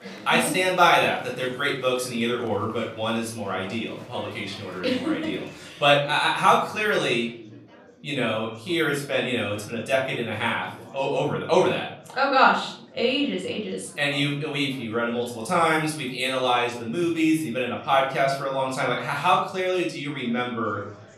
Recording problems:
off-mic speech; far
room echo; noticeable; dies away in 0.5 s
chatter from many people; faint; throughout; 25 dB below the speech

